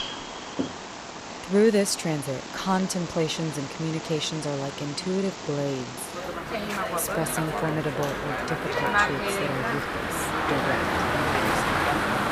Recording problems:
animal sounds; loud; throughout; as loud as the speech

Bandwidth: 15 kHz